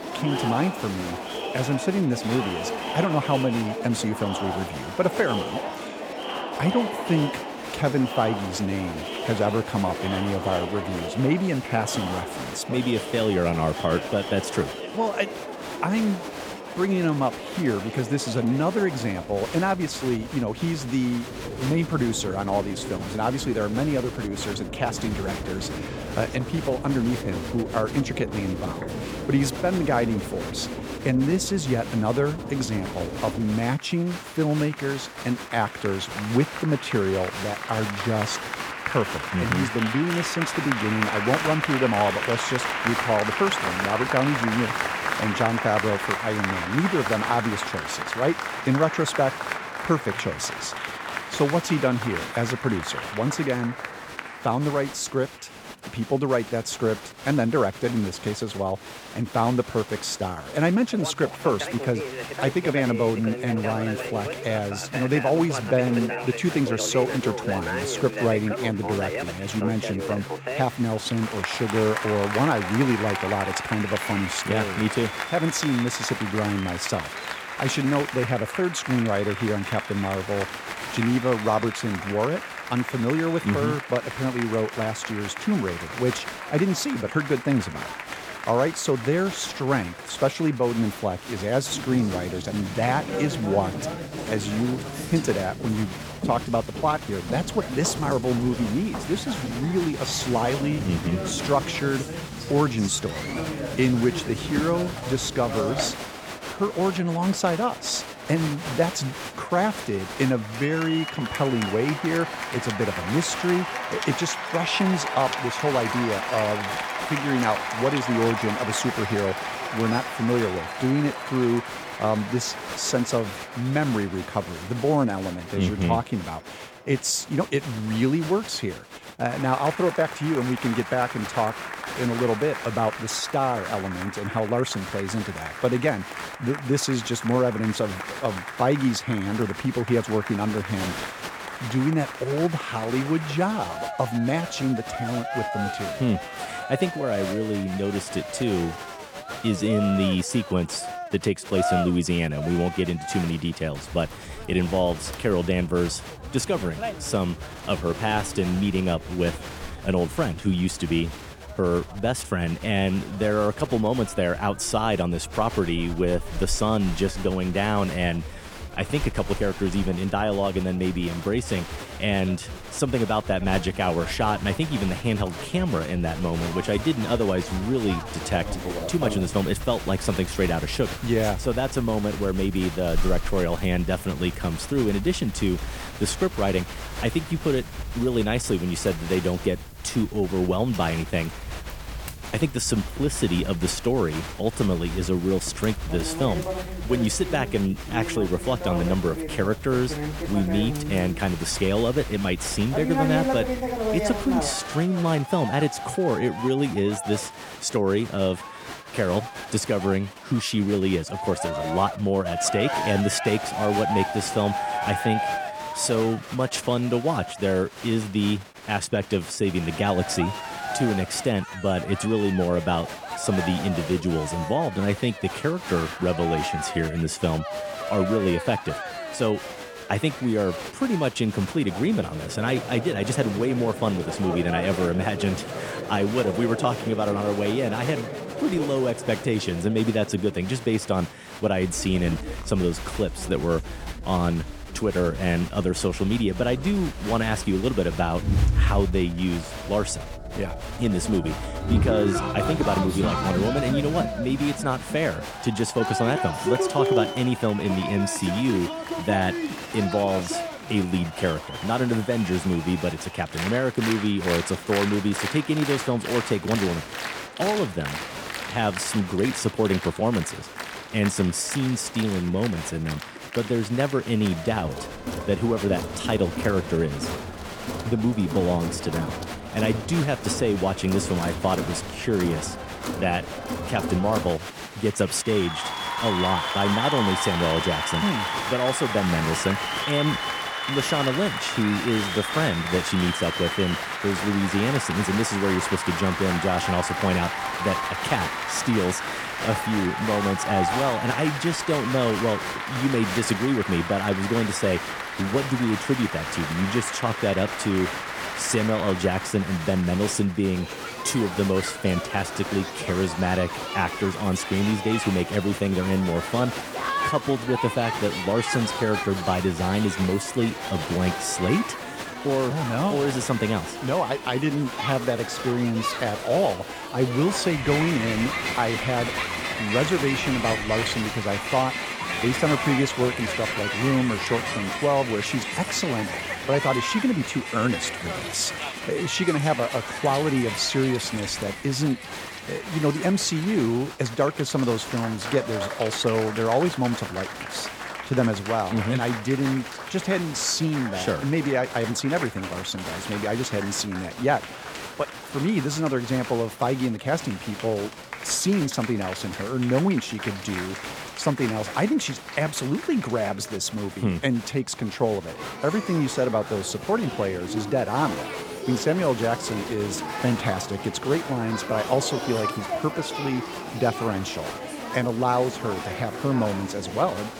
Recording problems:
crowd noise; loud; throughout; 6 dB below the speech

